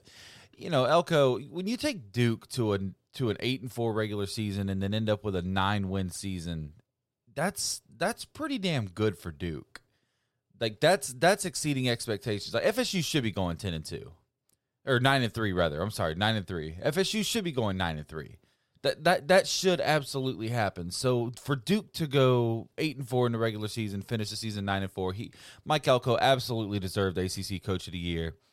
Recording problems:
none

